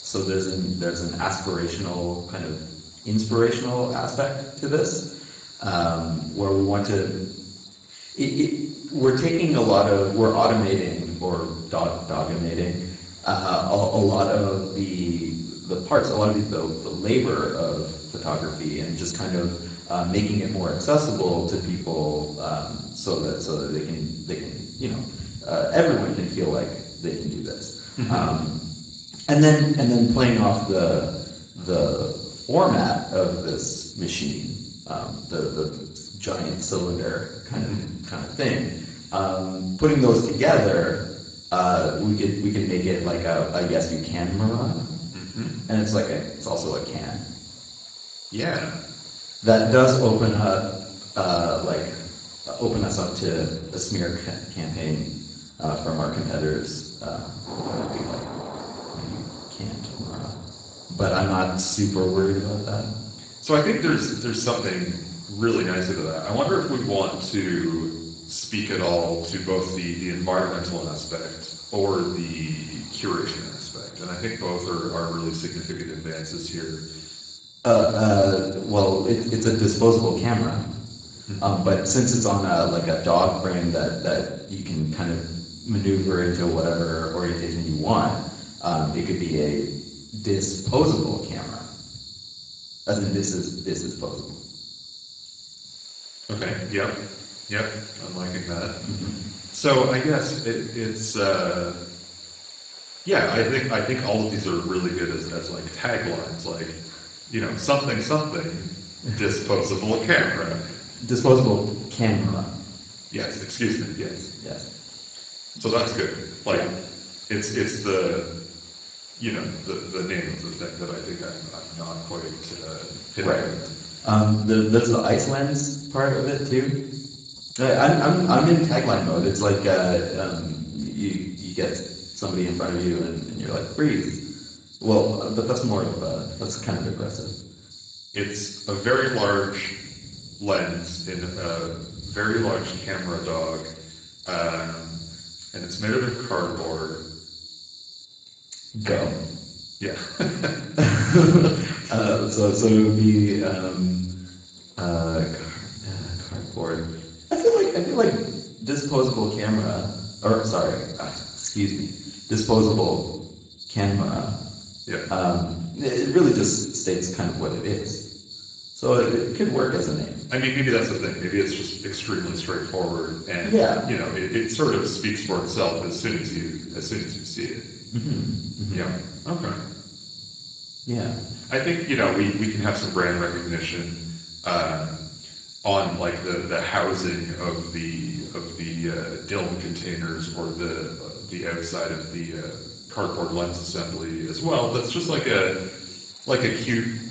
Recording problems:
off-mic speech; far
garbled, watery; badly; nothing above 7.5 kHz
room echo; noticeable; dies away in 0.7 s
high-pitched whine; faint; throughout; 3.5 kHz, 25 dB below the speech
rain or running water; faint; throughout; 25 dB below the speech
uneven, jittery; strongly; from 9 s to 2:32

